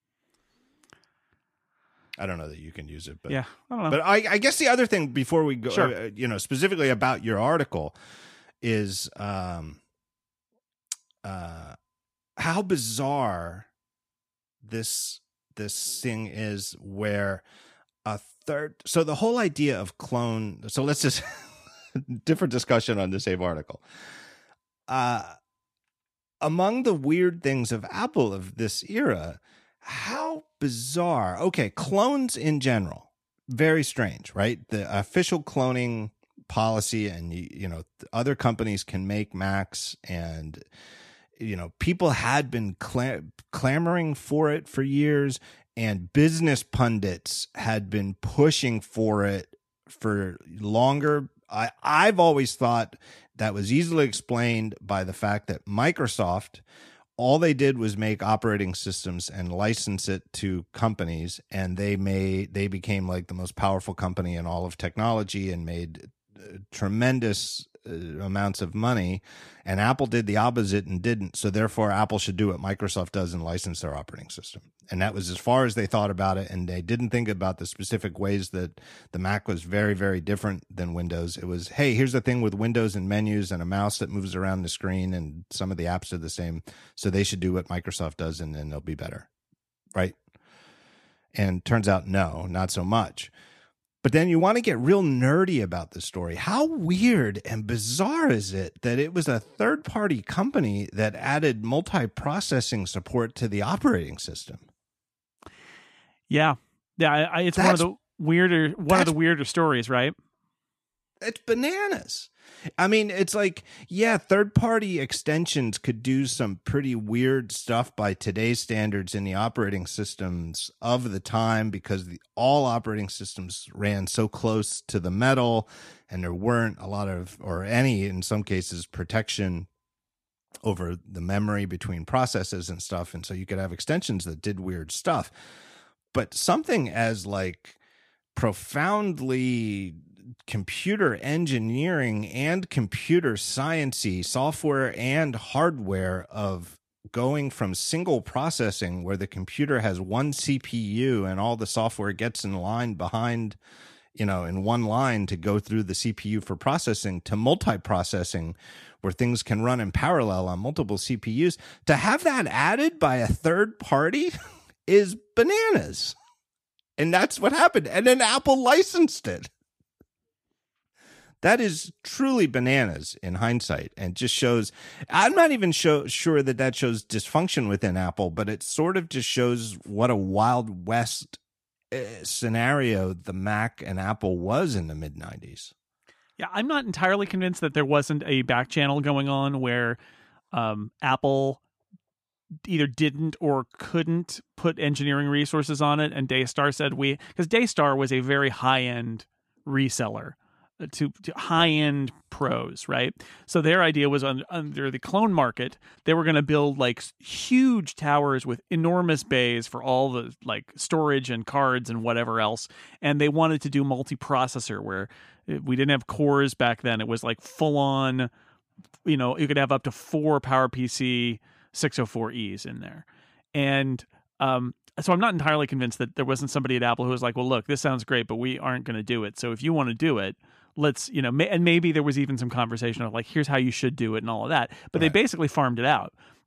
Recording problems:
none

